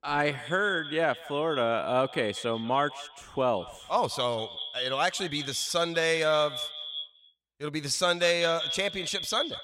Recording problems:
echo of what is said; strong; throughout; 190 ms later, 8 dB below the speech

